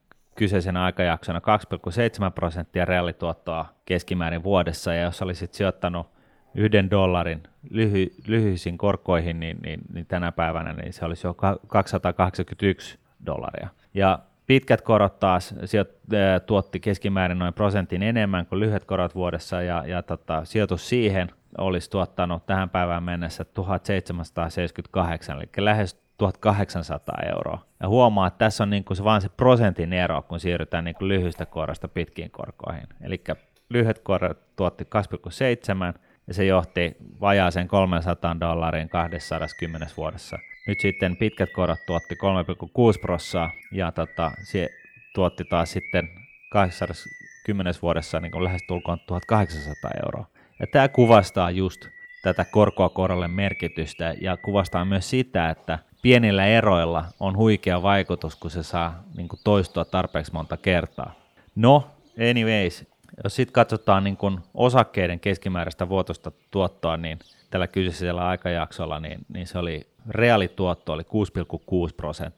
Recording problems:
animal sounds; noticeable; throughout; 15 dB below the speech

